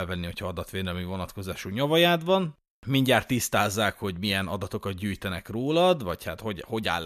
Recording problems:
abrupt cut into speech; at the start and the end

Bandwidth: 14.5 kHz